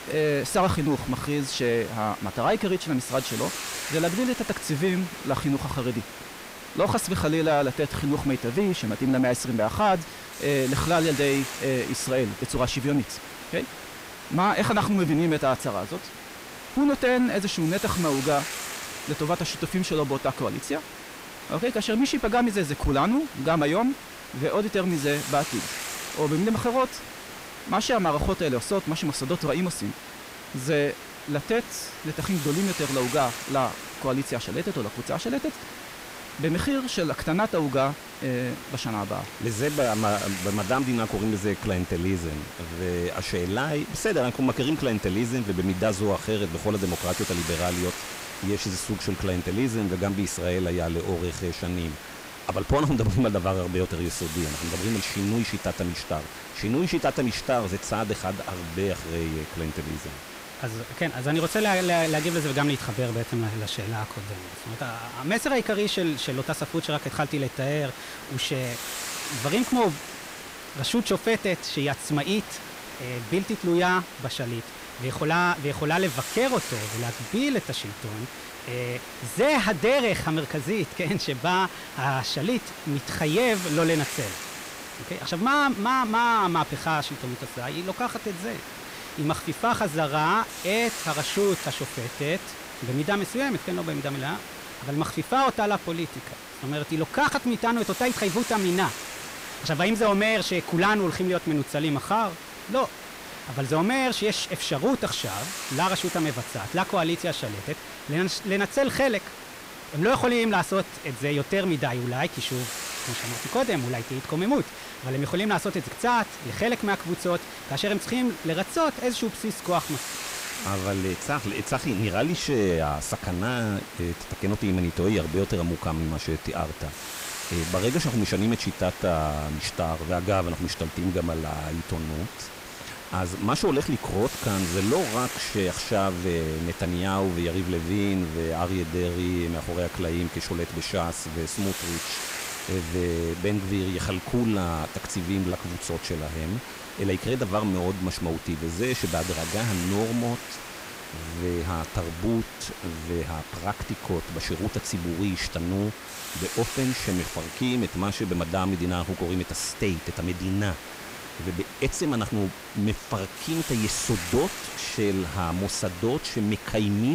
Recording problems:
distortion; slight; 10 dB below the speech
hiss; loud; throughout; 10 dB below the speech
abrupt cut into speech; at the end

